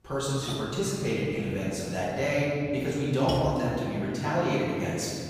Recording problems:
room echo; strong; dies away in 2.5 s
off-mic speech; far
rain or running water; very faint; throughout; 10 dB below the speech

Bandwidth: 15.5 kHz